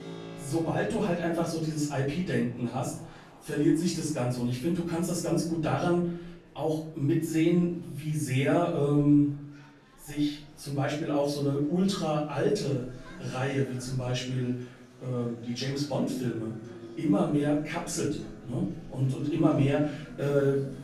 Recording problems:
off-mic speech; far
room echo; noticeable; dies away in 0.5 s
background music; noticeable; throughout; 20 dB below the speech
murmuring crowd; faint; throughout; 30 dB below the speech

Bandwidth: 13.5 kHz